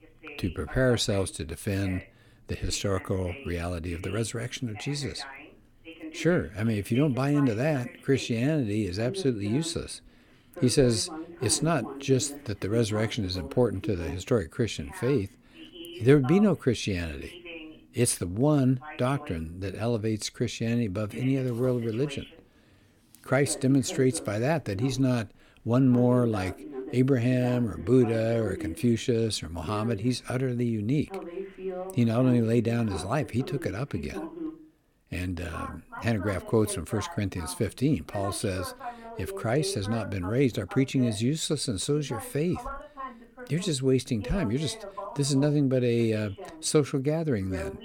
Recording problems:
voice in the background; noticeable; throughout; 15 dB below the speech

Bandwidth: 17 kHz